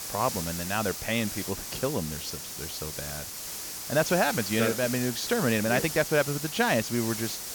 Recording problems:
high frequencies cut off; noticeable; nothing above 7 kHz
hiss; loud; throughout; 5 dB below the speech

